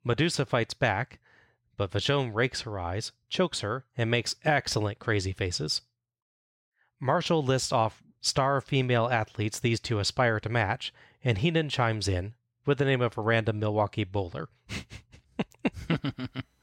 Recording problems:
none

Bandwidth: 16 kHz